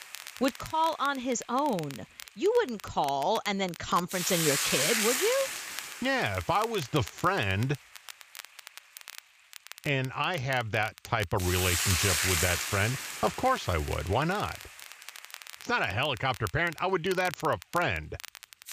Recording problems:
high frequencies cut off; noticeable; nothing above 7.5 kHz
hiss; loud; throughout; as loud as the speech
crackle, like an old record; noticeable; 15 dB below the speech

